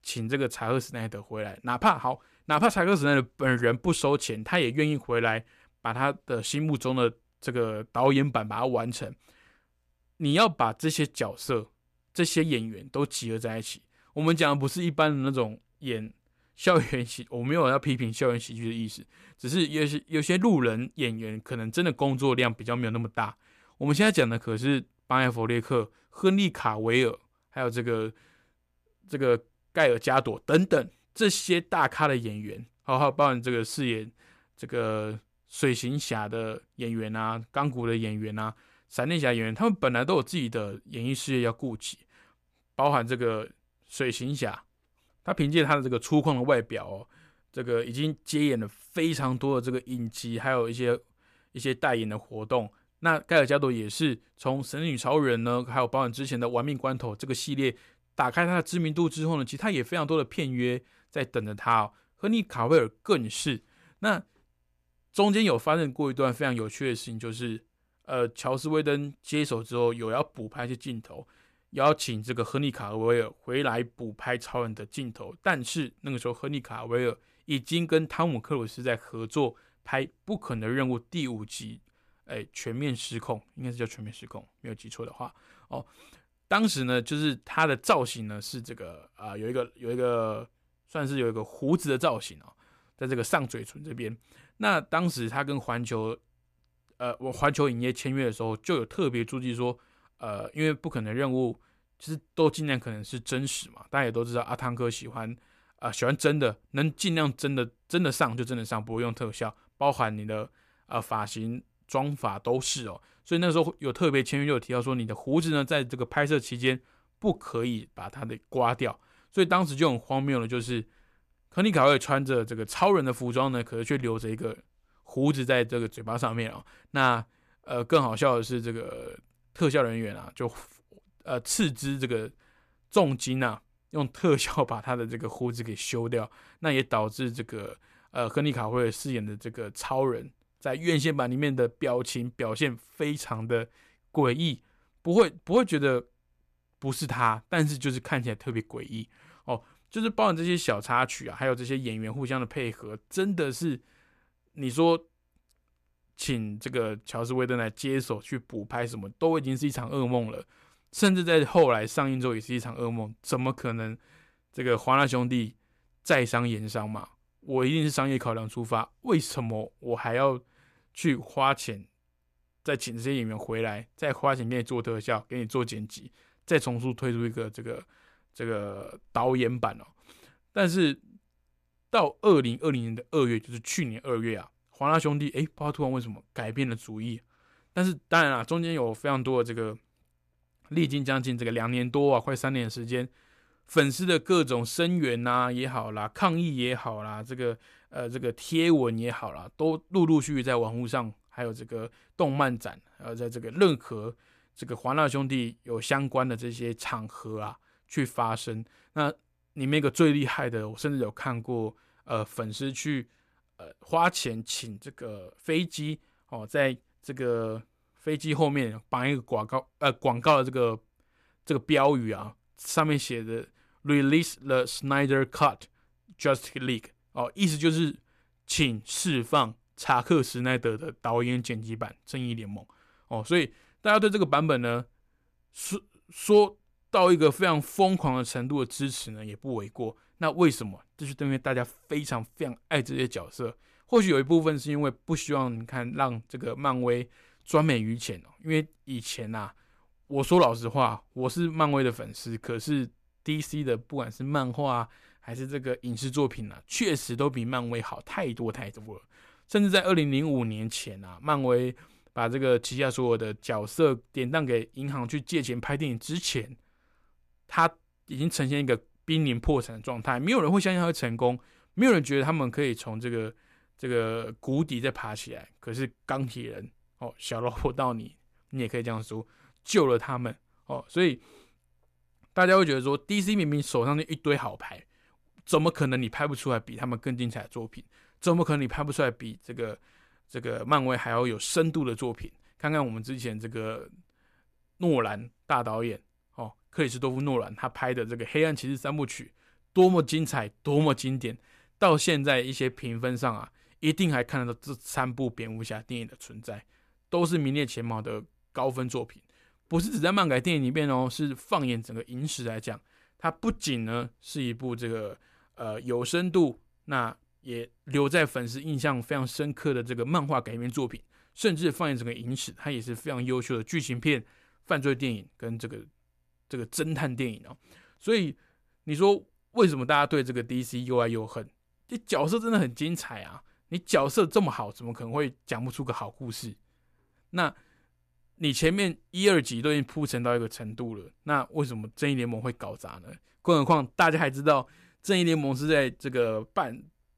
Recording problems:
none

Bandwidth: 14.5 kHz